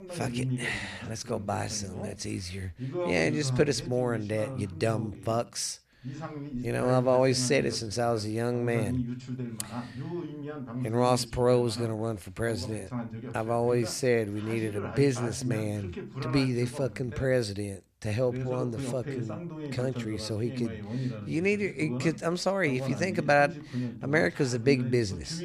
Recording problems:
voice in the background; loud; throughout; 8 dB below the speech

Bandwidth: 14.5 kHz